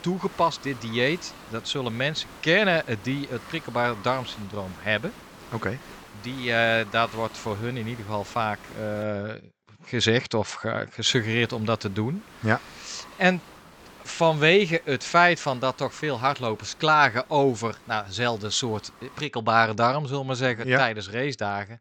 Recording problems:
high frequencies cut off; noticeable; nothing above 8 kHz
hiss; faint; until 9 s and from 11 to 19 s; 20 dB below the speech

